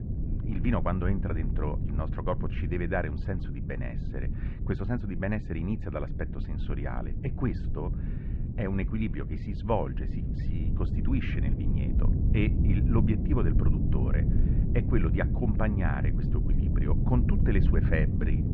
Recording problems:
muffled; very; fading above 2 kHz
low rumble; loud; throughout; 6 dB below the speech

